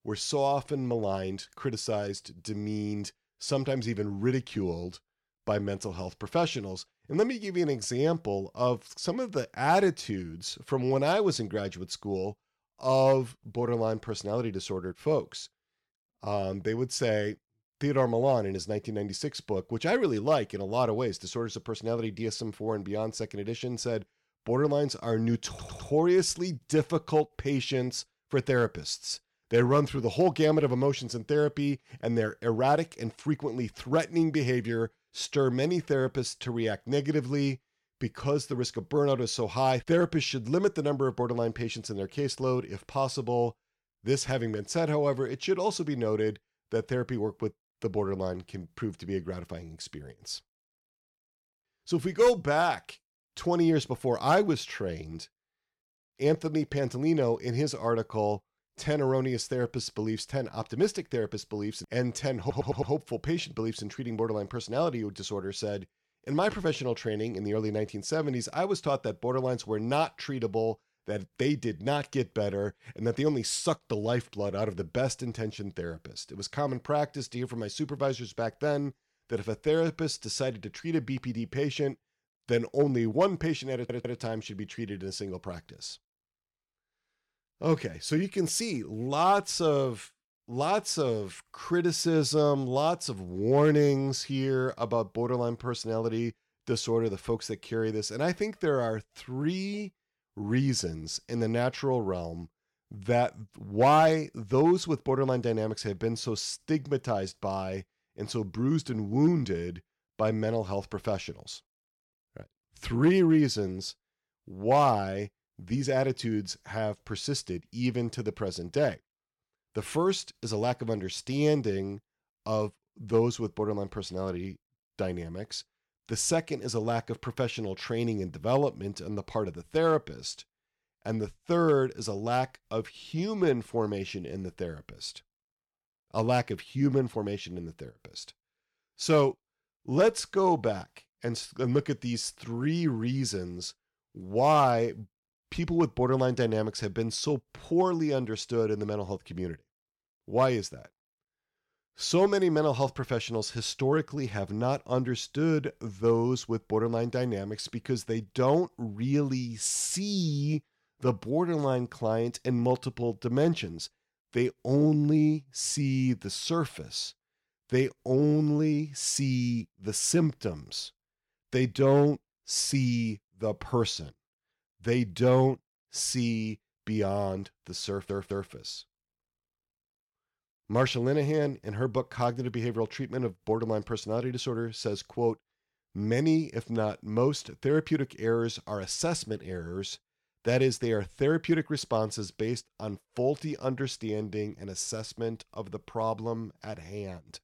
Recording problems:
audio stuttering; 4 times, first at 25 s

